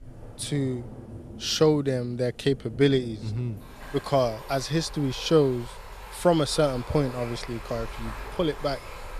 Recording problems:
rain or running water; noticeable; throughout; 15 dB below the speech

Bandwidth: 14.5 kHz